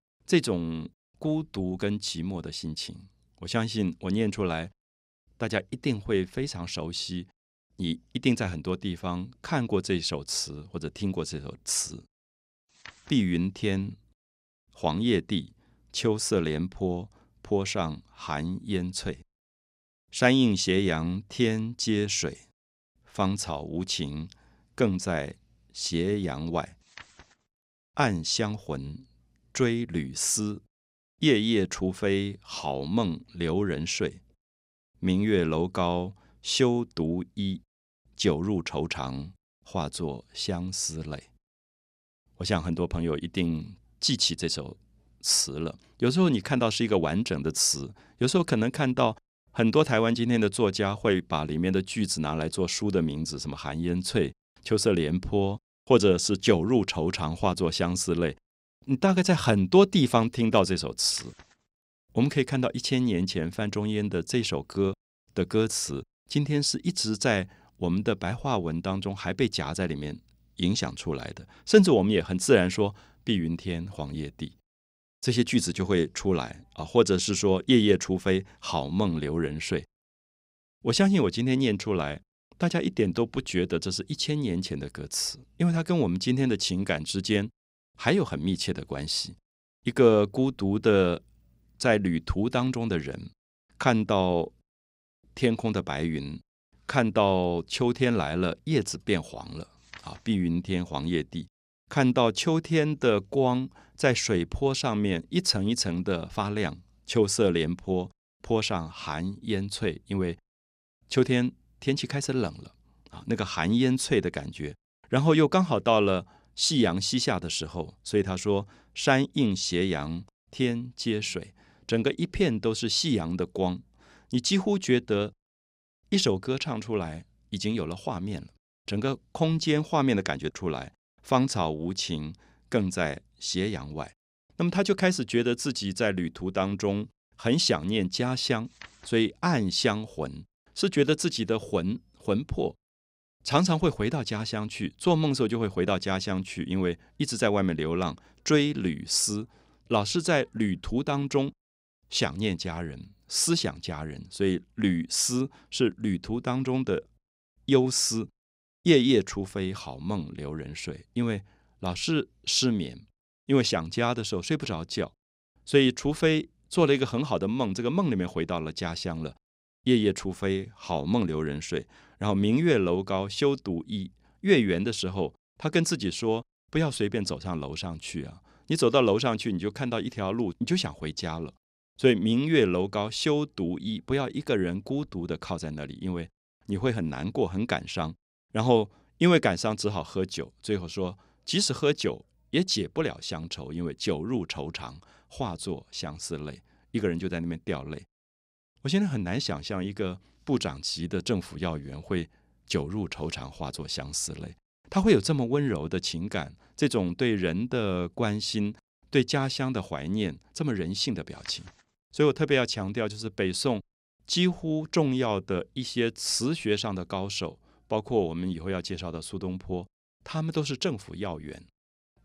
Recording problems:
none

